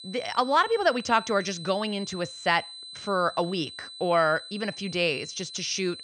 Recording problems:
high-pitched whine; noticeable; throughout; 4 kHz, 15 dB below the speech

